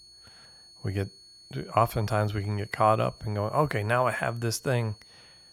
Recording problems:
high-pitched whine; faint; throughout; 4.5 kHz, 20 dB below the speech

